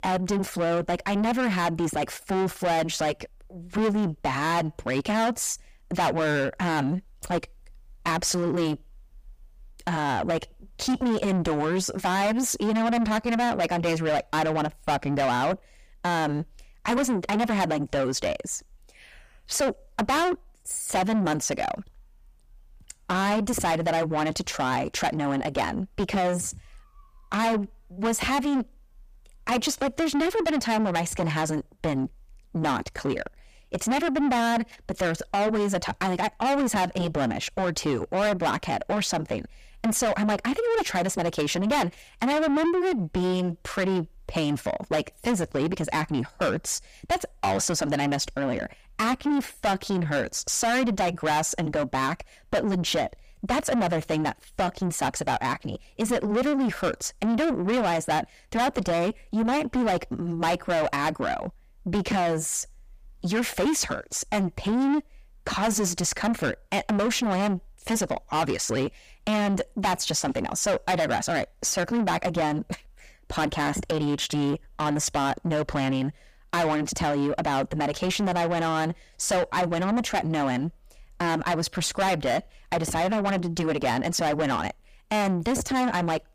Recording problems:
distortion; heavy; 6 dB below the speech

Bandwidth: 15 kHz